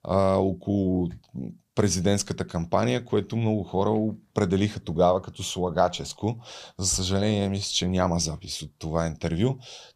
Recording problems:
none

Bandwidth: 15 kHz